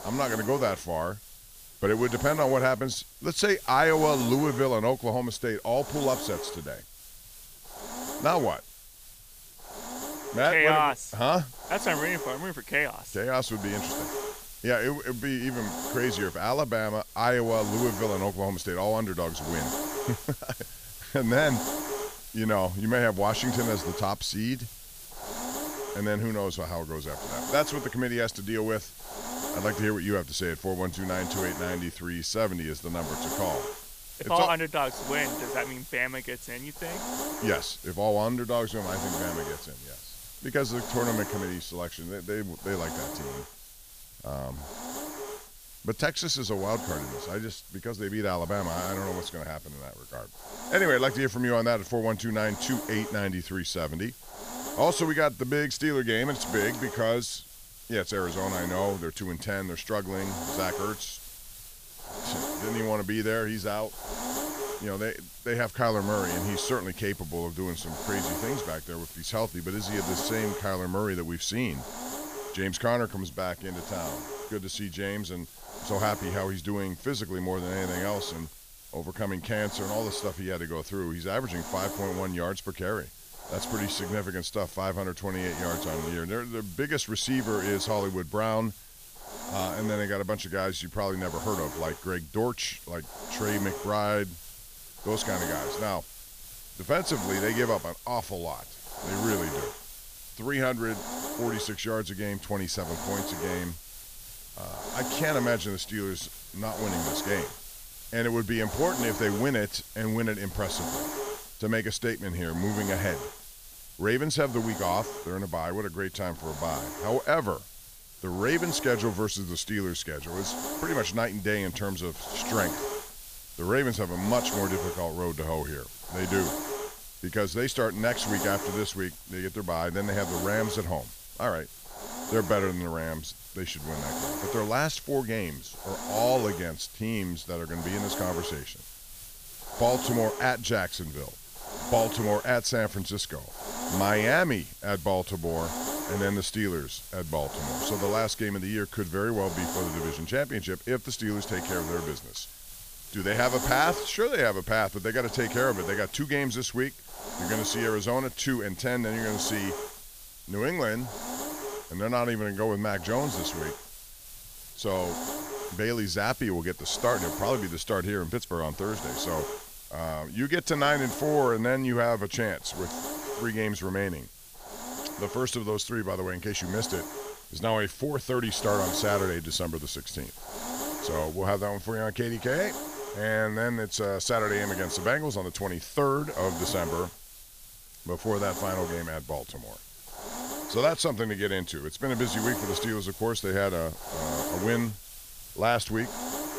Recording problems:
hiss; loud; throughout; 8 dB below the speech

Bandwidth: 15 kHz